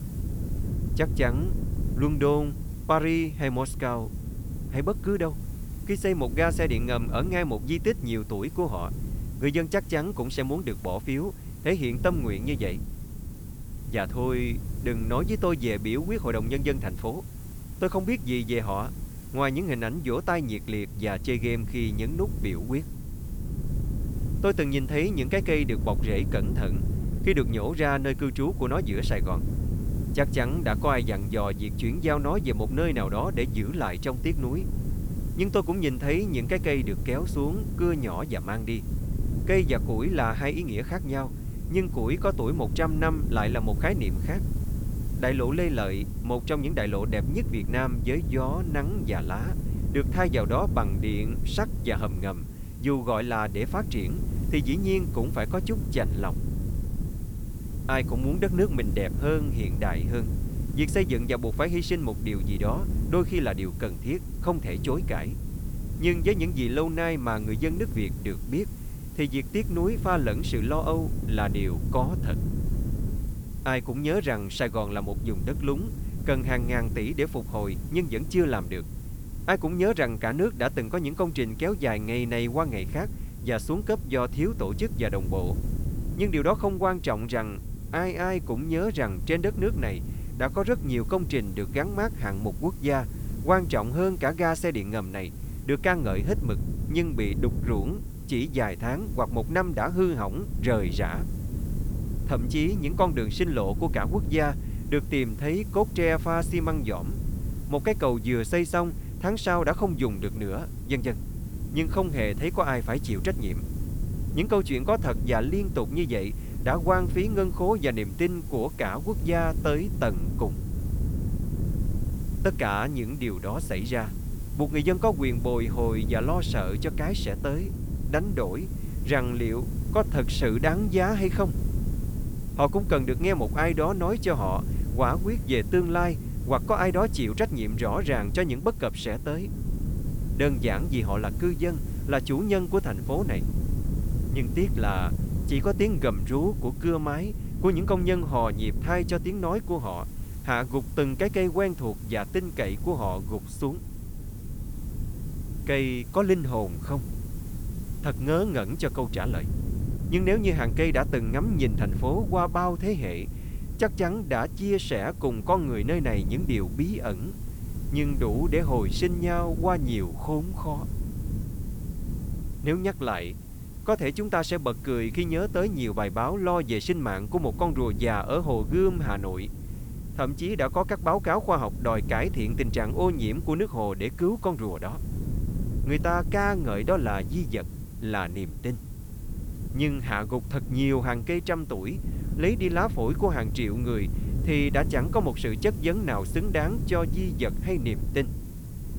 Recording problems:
wind noise on the microphone; occasional gusts; 15 dB below the speech
hiss; faint; throughout; 20 dB below the speech

